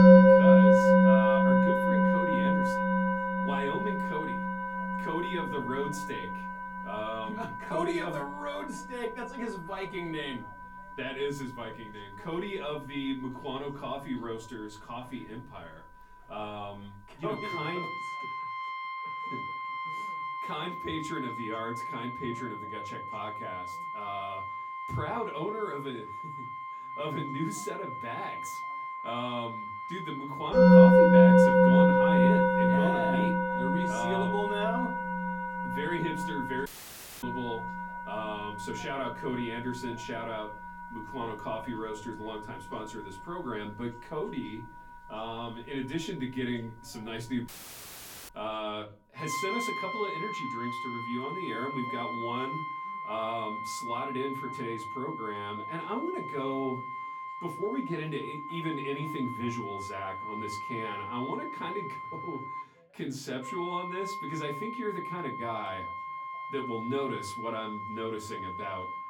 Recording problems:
off-mic speech; far
room echo; very slight; dies away in 0.3 s
background music; very loud; throughout; 8 dB above the speech
voice in the background; faint; throughout; 25 dB below the speech
audio cutting out; at 37 s for 0.5 s and at 47 s for 1 s

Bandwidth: 17 kHz